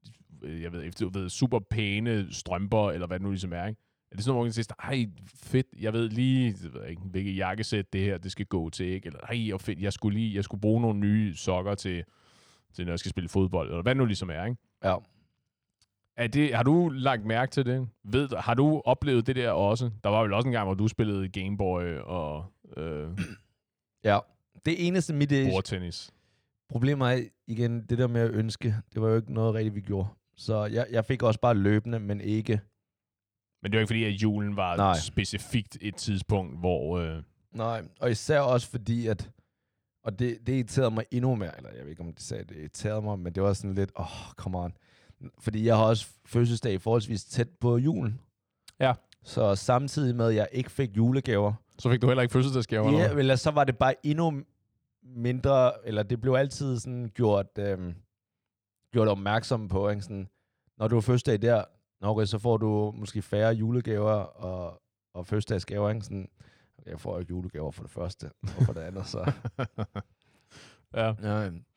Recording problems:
none

